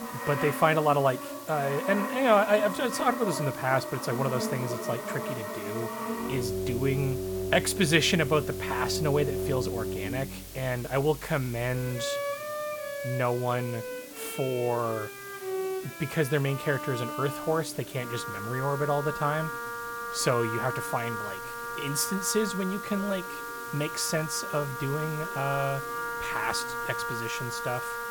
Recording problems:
background music; loud; throughout; 6 dB below the speech
hiss; noticeable; throughout; 15 dB below the speech
chatter from many people; faint; throughout; 25 dB below the speech

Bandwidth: 18 kHz